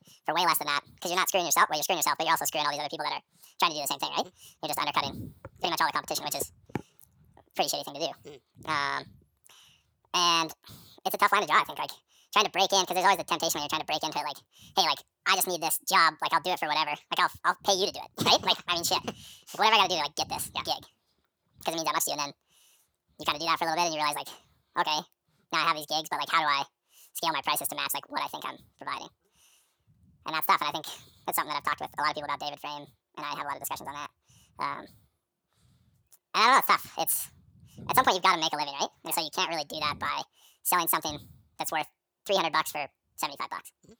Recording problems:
wrong speed and pitch; too fast and too high; 1.7 times normal speed

